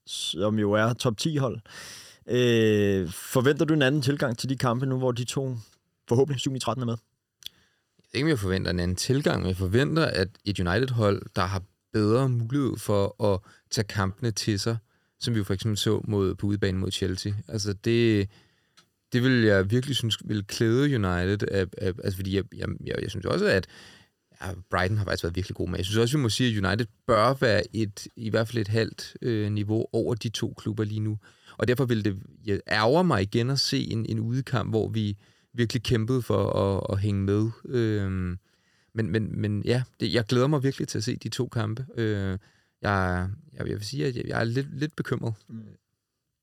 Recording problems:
uneven, jittery; strongly; from 2.5 to 45 s

